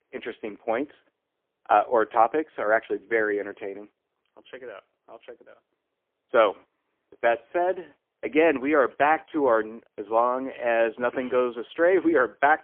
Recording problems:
phone-call audio; poor line; nothing above 3.5 kHz

